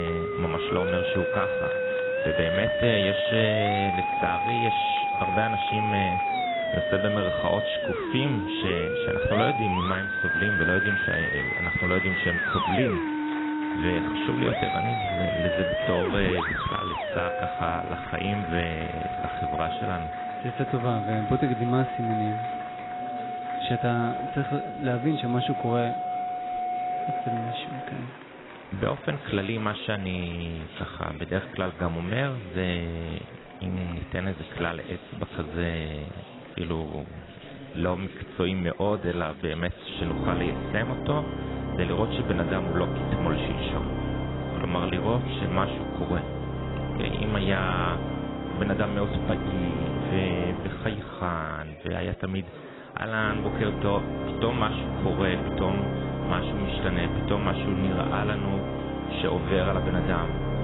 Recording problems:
garbled, watery; badly; nothing above 4 kHz
background music; very loud; throughout; as loud as the speech
murmuring crowd; noticeable; throughout; 15 dB below the speech
abrupt cut into speech; at the start

